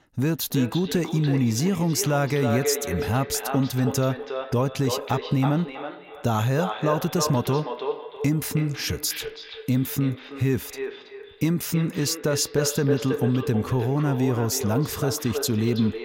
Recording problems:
echo of what is said; strong; throughout; 320 ms later, 8 dB below the speech

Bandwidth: 16 kHz